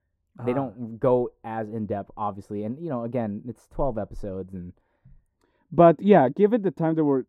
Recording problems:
muffled; very; fading above 1.5 kHz

